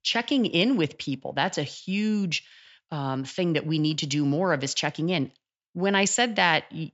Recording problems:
high frequencies cut off; noticeable; nothing above 8 kHz

